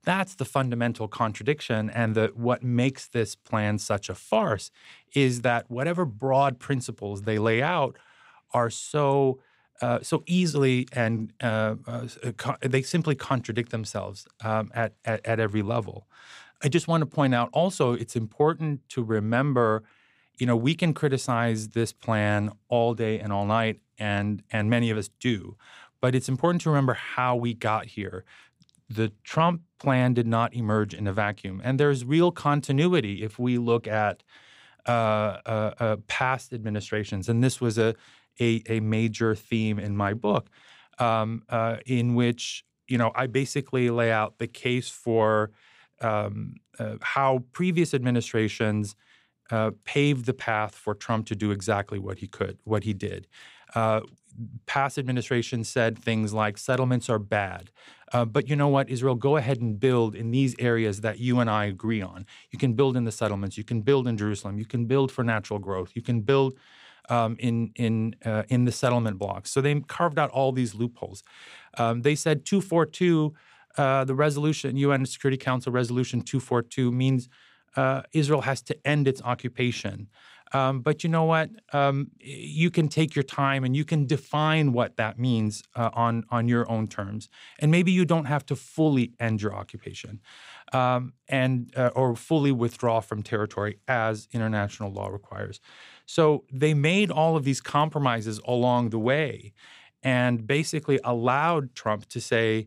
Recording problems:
none

